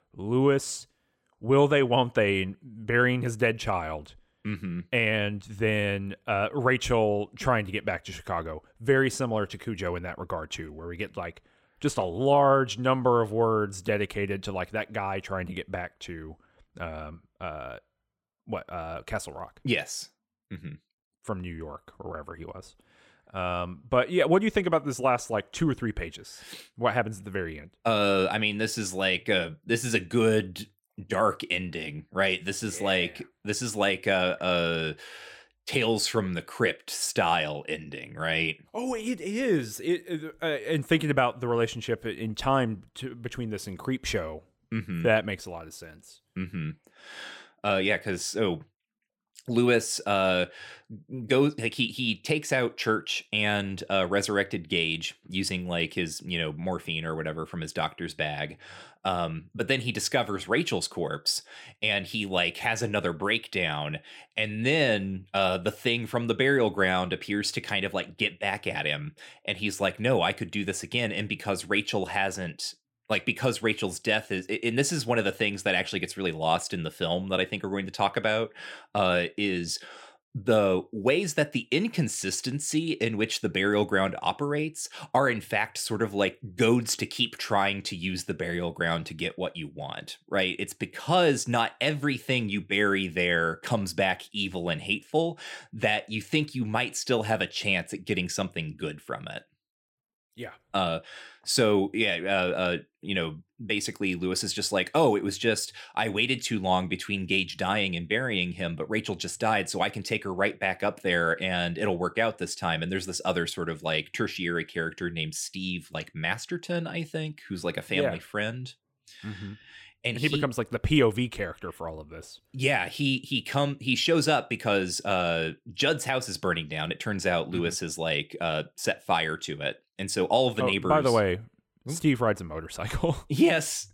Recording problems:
none

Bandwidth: 16.5 kHz